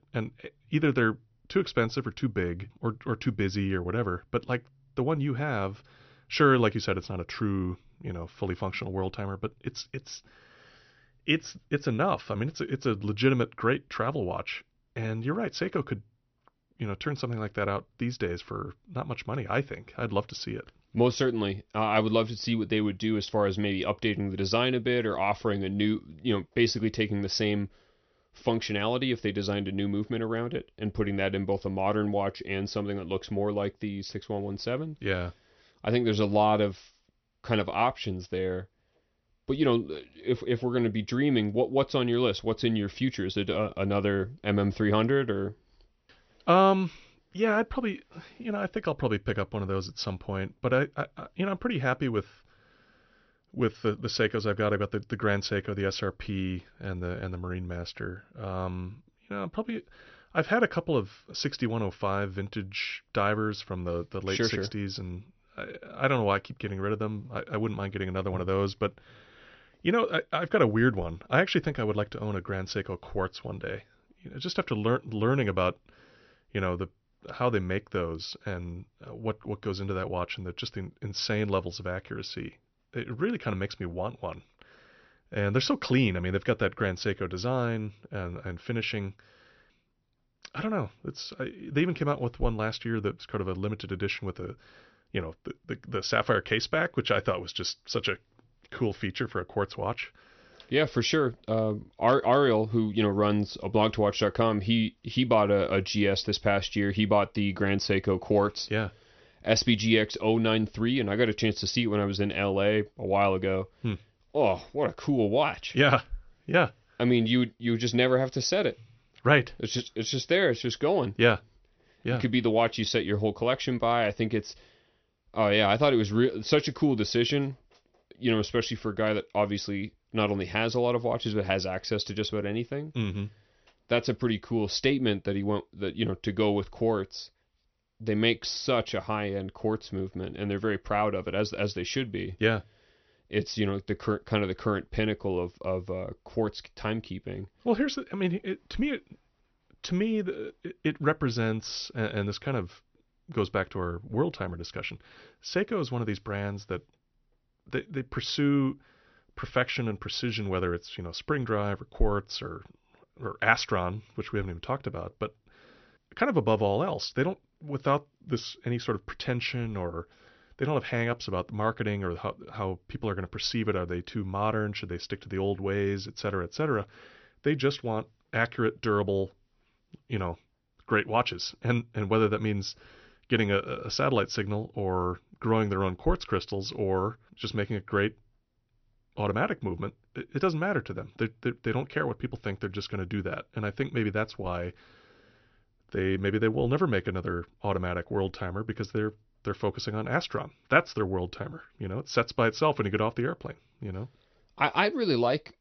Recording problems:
high frequencies cut off; noticeable; nothing above 6 kHz

